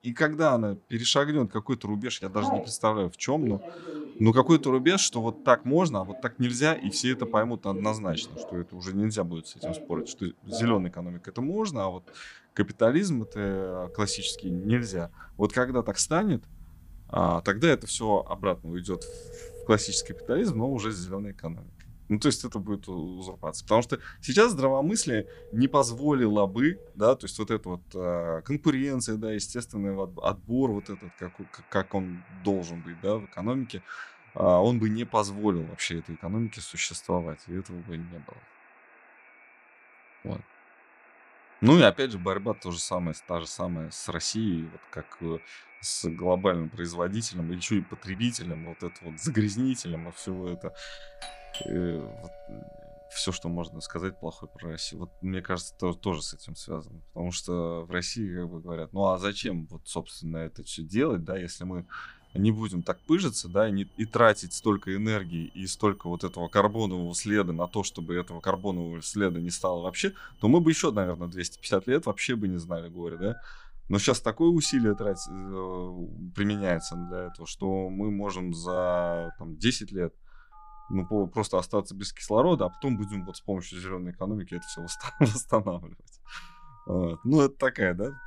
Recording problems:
alarms or sirens; noticeable; throughout; 20 dB below the speech

